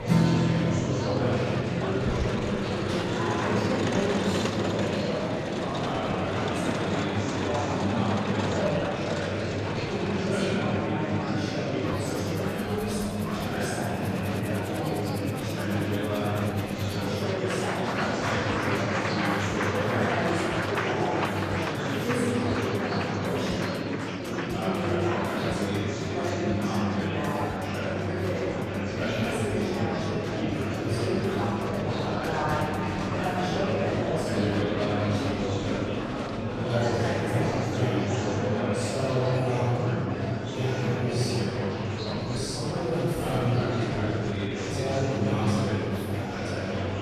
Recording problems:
room echo; strong; dies away in 3 s
off-mic speech; far
murmuring crowd; very loud; throughout; 3 dB above the speech
background music; loud; throughout; 6 dB below the speech

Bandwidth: 14.5 kHz